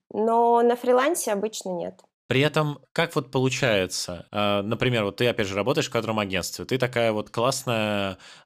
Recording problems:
none

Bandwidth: 14.5 kHz